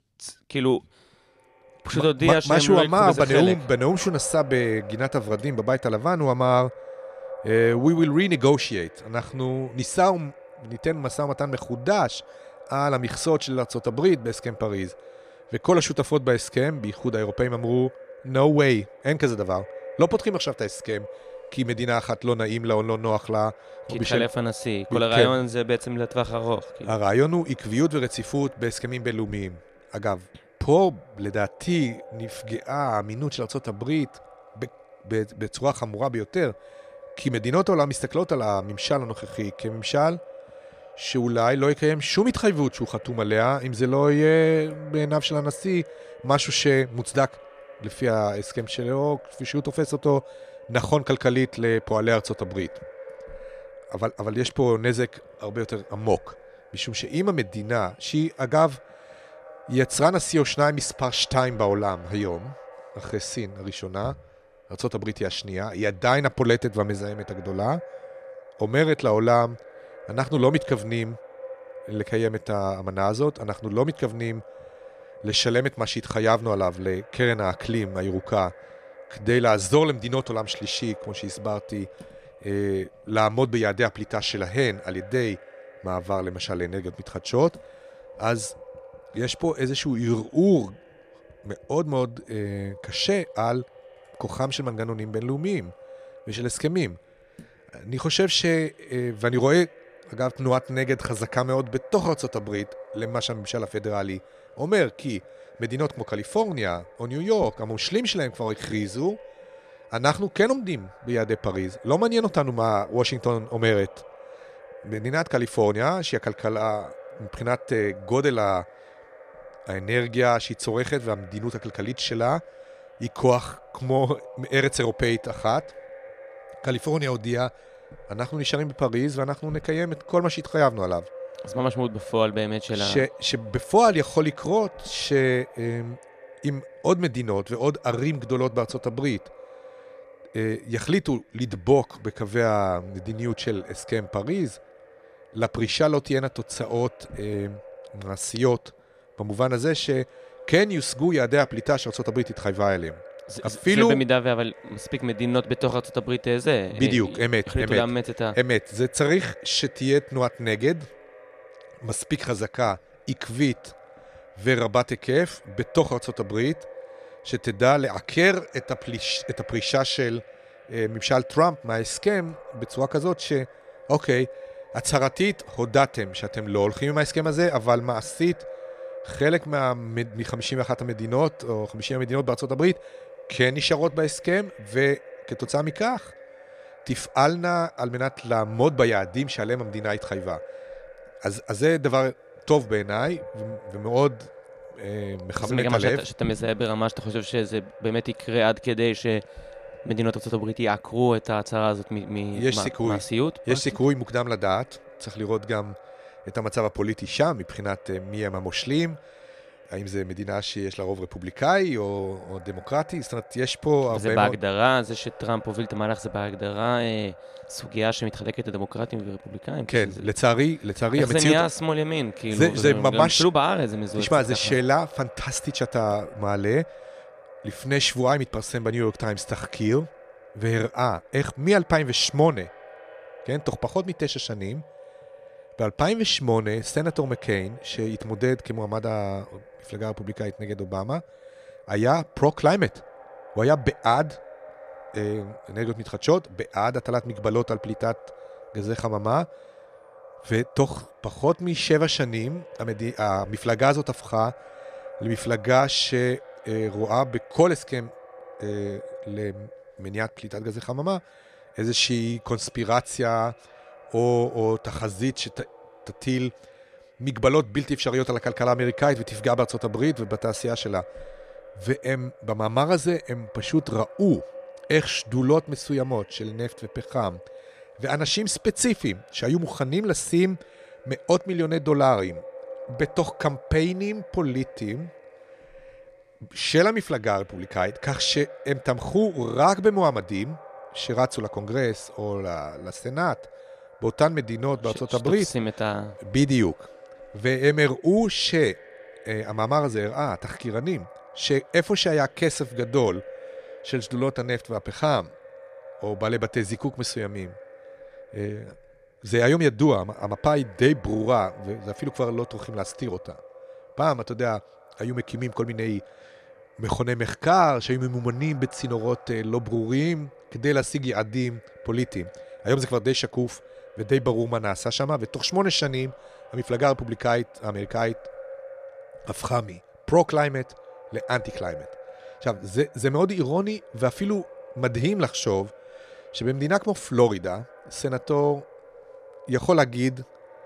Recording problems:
echo of what is said; faint; throughout; 220 ms later, 20 dB below the speech

